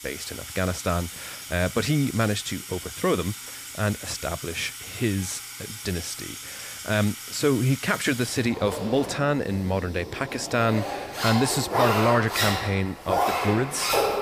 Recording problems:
household noises; loud; throughout; 5 dB below the speech

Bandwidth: 15 kHz